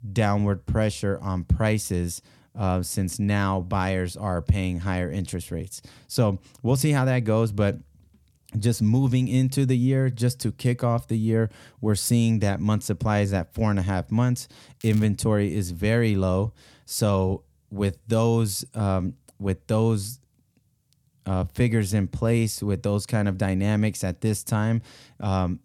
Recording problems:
crackling; faint; at 15 s; 25 dB below the speech

